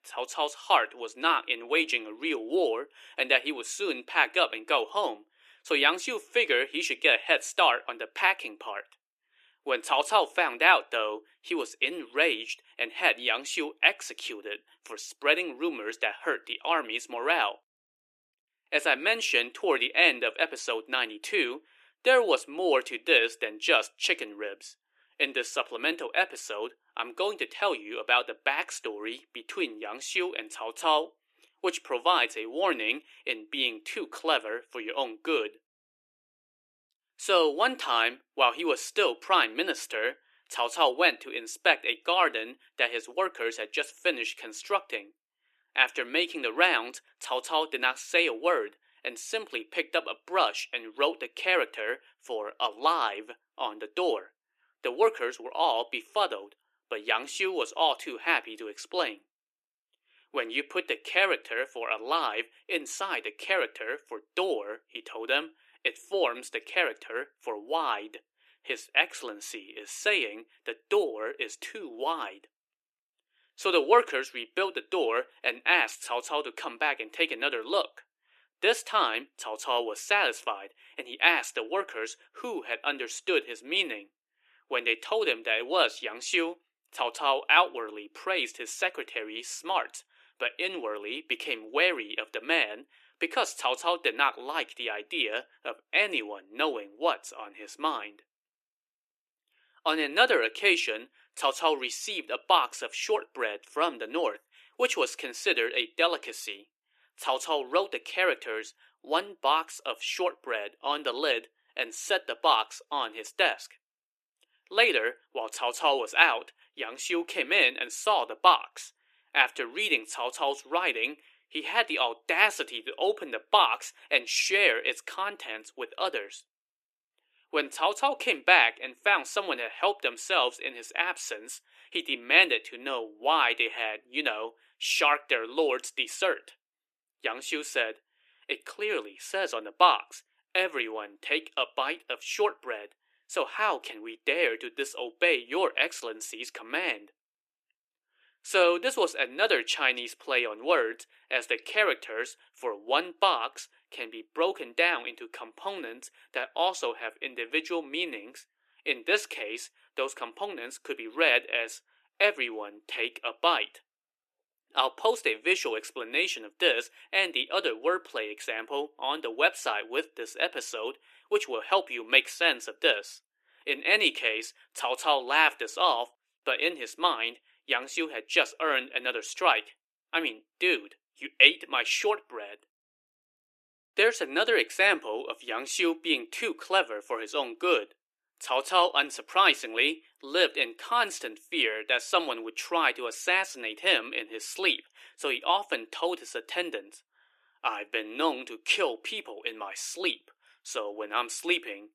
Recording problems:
thin; somewhat; fading below 350 Hz

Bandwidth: 14 kHz